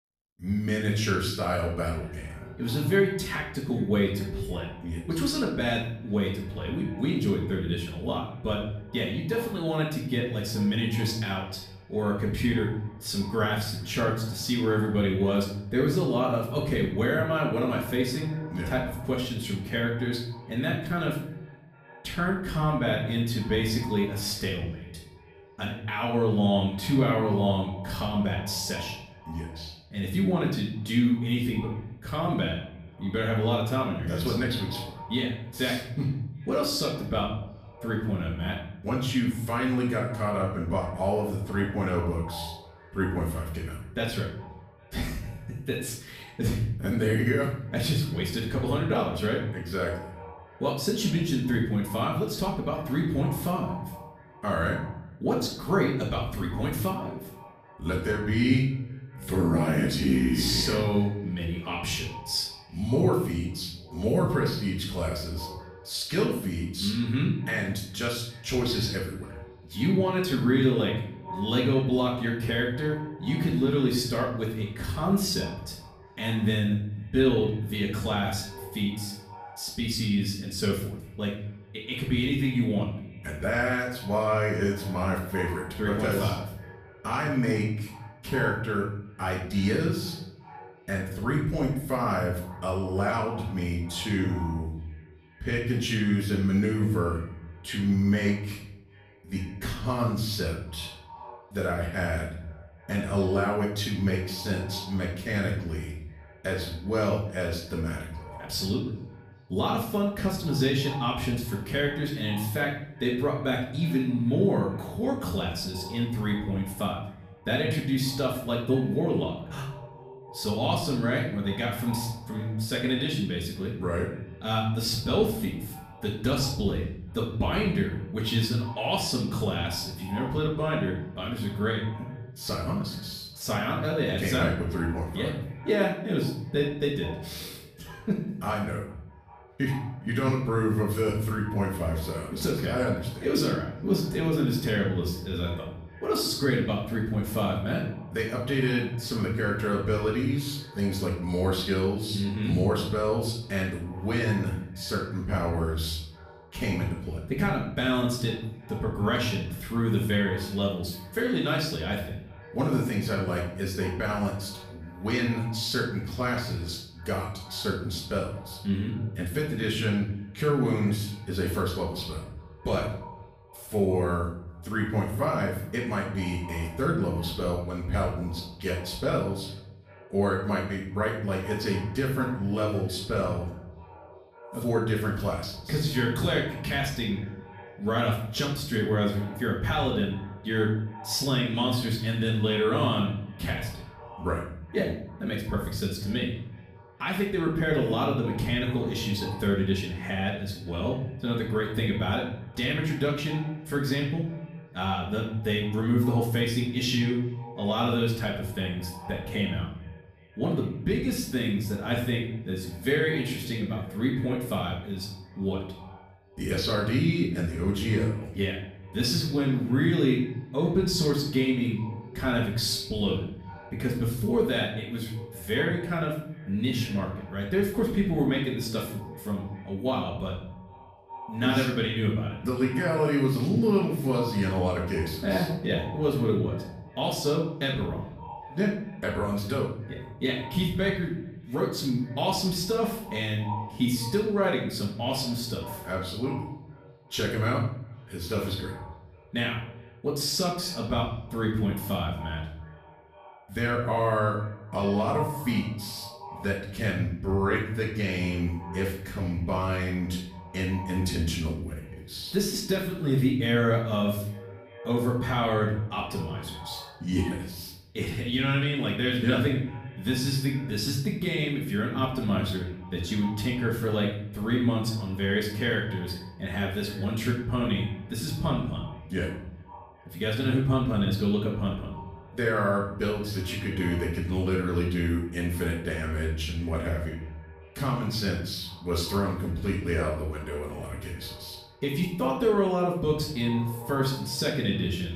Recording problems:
off-mic speech; far
room echo; noticeable; dies away in 0.7 s
echo of what is said; faint; throughout; 400 ms later, 20 dB below the speech

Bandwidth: 15 kHz